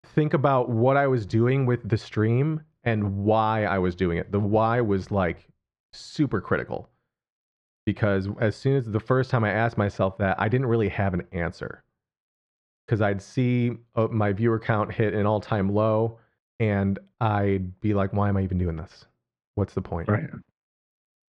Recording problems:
muffled; very; fading above 1.5 kHz

